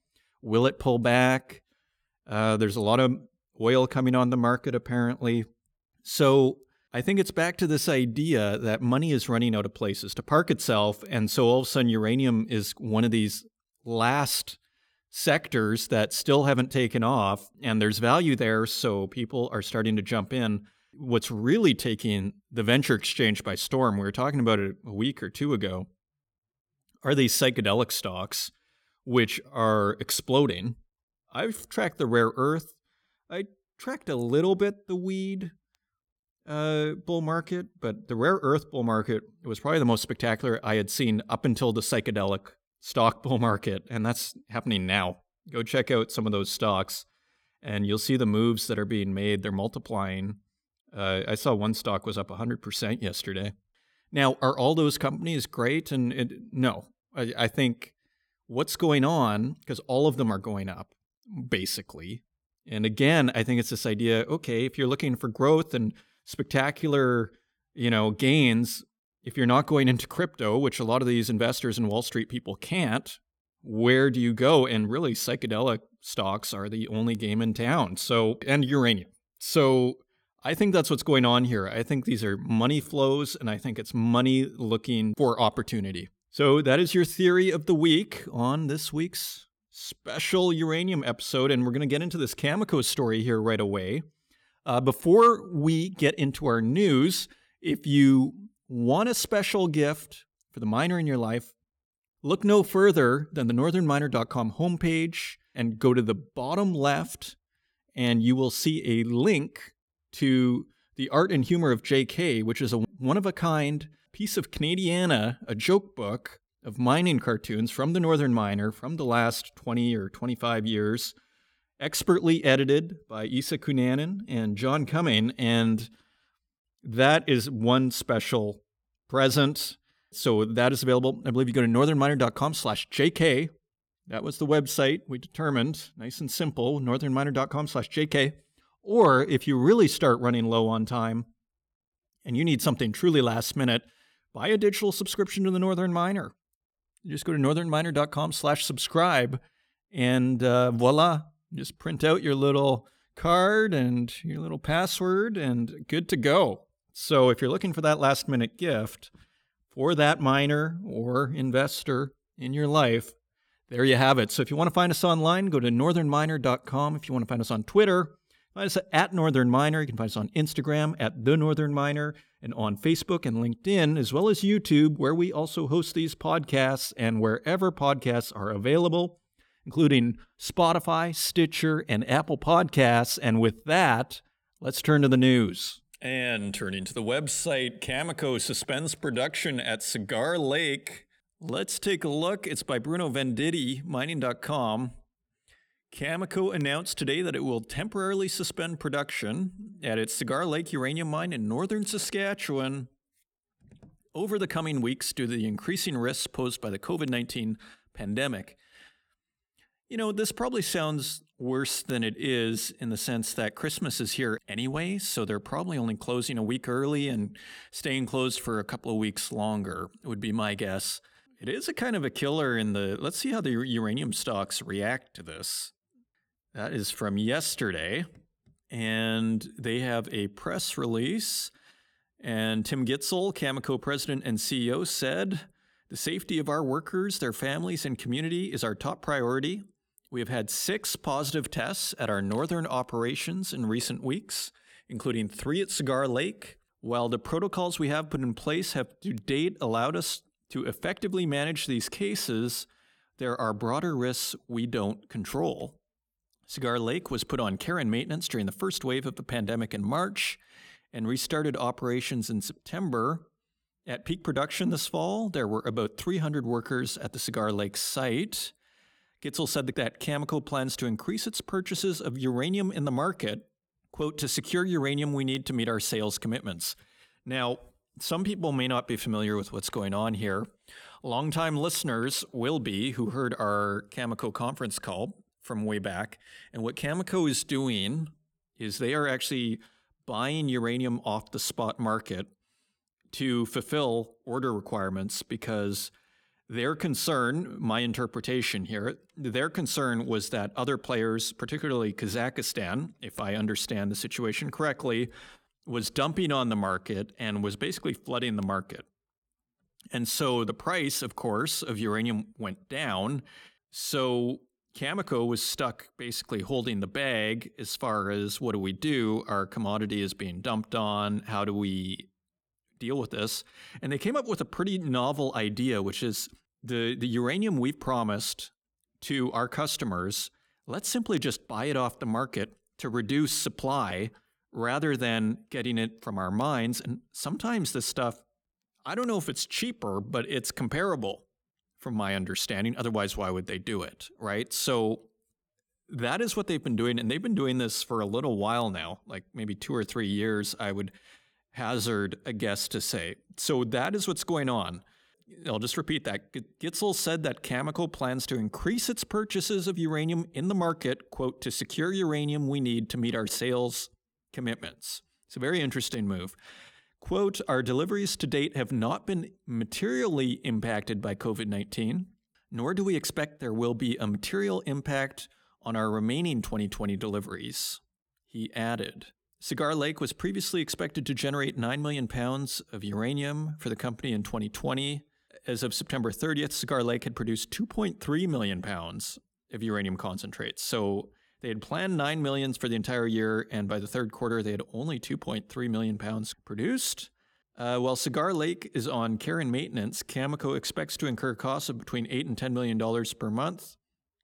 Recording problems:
none

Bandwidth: 18 kHz